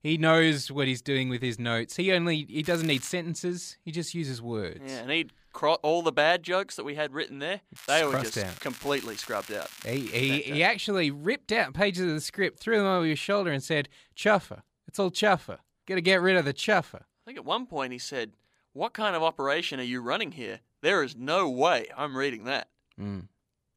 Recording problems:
crackling; noticeable; at 2.5 s and from 8 to 10 s; 15 dB below the speech

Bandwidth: 15 kHz